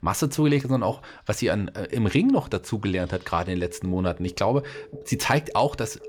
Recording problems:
alarms or sirens; noticeable; throughout; 20 dB below the speech

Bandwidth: 18 kHz